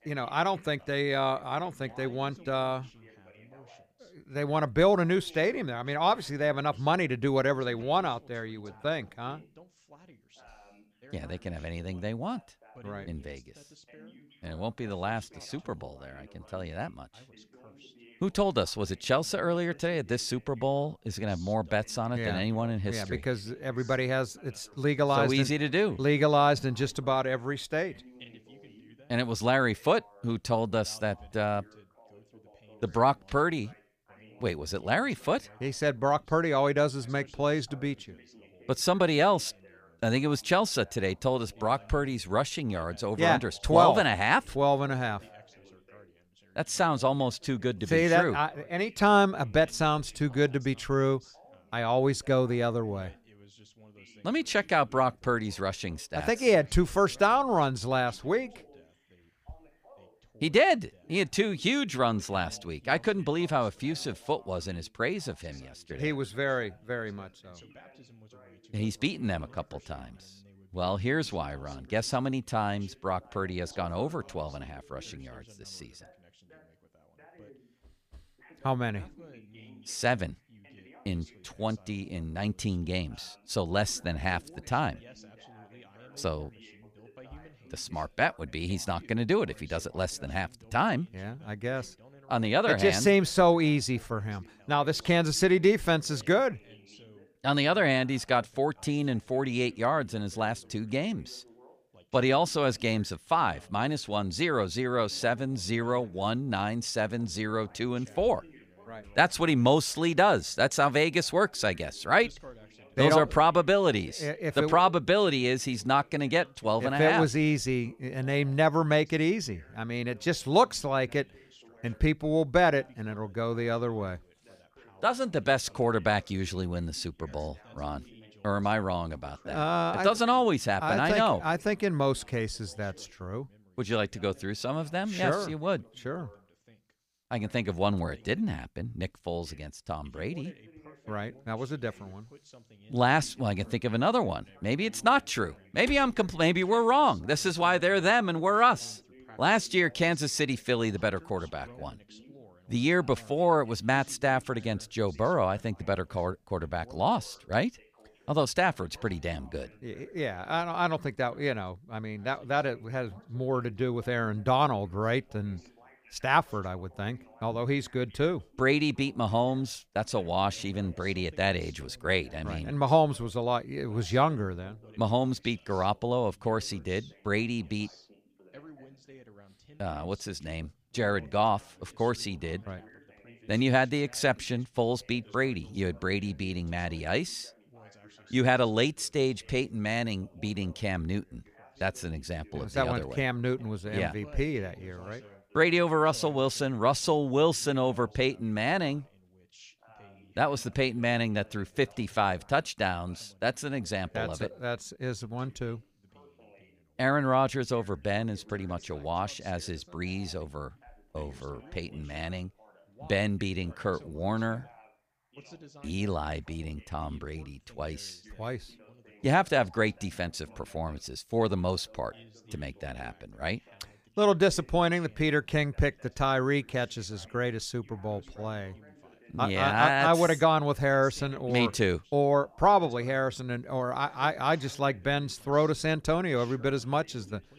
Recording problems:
background chatter; faint; throughout; 2 voices, 25 dB below the speech

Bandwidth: 15 kHz